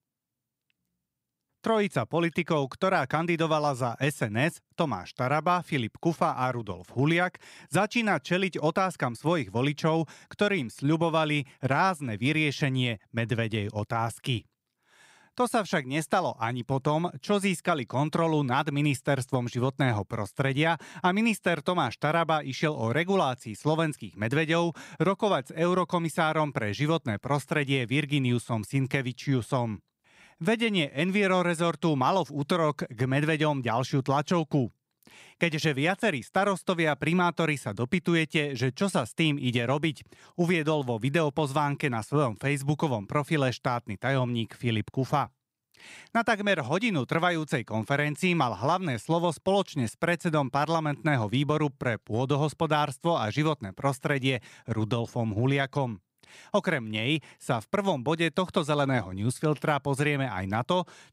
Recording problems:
none

